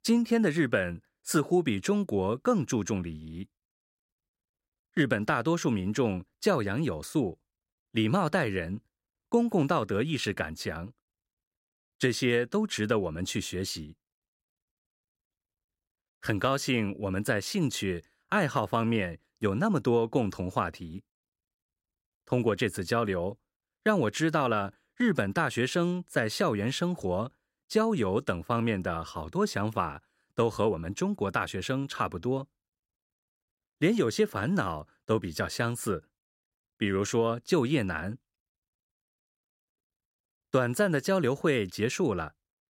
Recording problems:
none

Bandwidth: 16 kHz